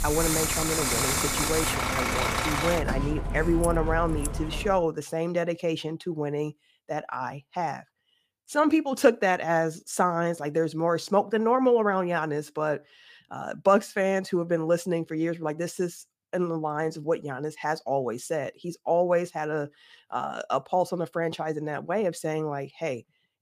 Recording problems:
traffic noise; very loud; until 4.5 s; as loud as the speech

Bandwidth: 15 kHz